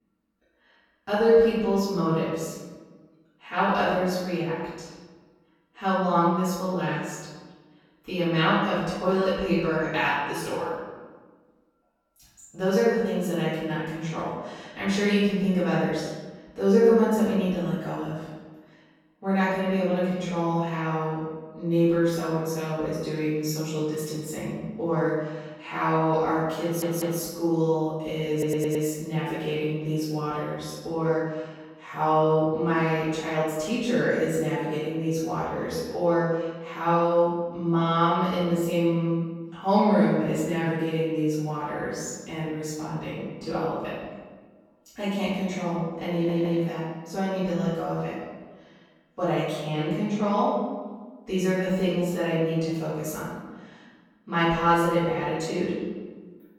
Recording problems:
room echo; strong; dies away in 1.2 s
off-mic speech; far
audio stuttering; at 27 s, at 28 s and at 46 s

